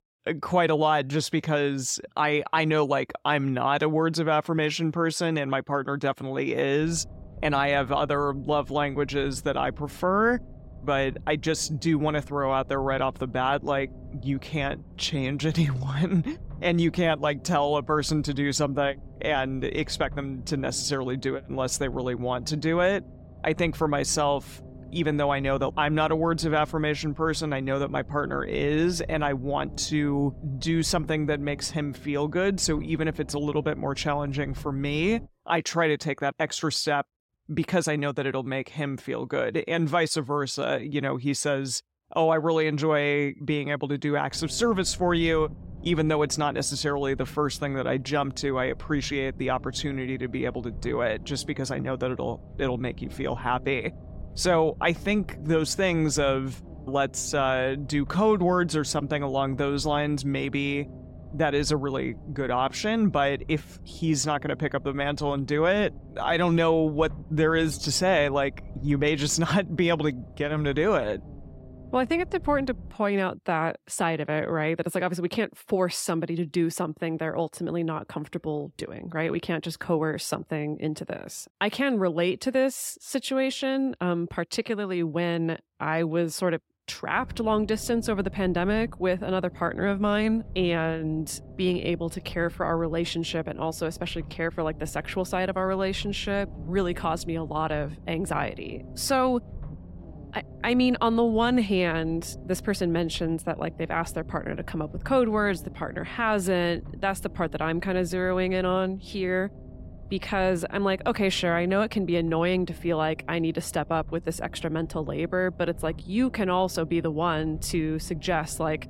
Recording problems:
low rumble; faint; from 7 to 35 s, from 44 s to 1:13 and from 1:27 on; 25 dB below the speech

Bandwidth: 16 kHz